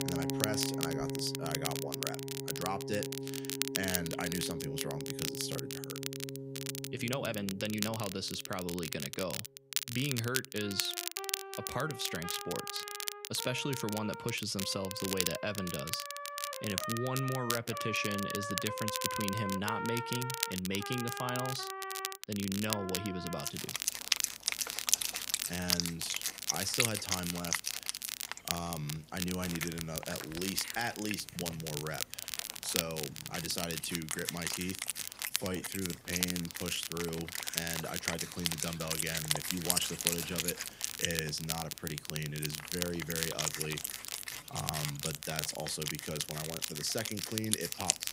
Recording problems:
background music; loud; throughout; 1 dB below the speech
crackle, like an old record; loud; 1 dB below the speech
uneven, jittery; strongly; from 7 to 45 s

